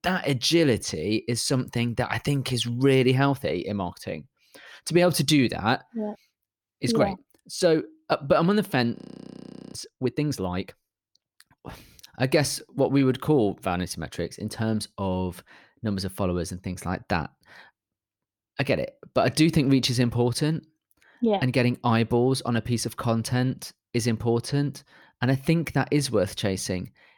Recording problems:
audio freezing; at 9 s for 1 s

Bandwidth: 18.5 kHz